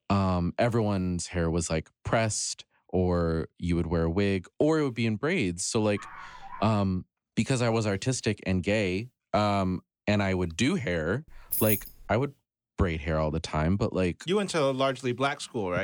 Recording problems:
dog barking; faint; at 6 s; peak 15 dB below the speech
jangling keys; loud; at 11 s; peak 2 dB above the speech
abrupt cut into speech; at the end

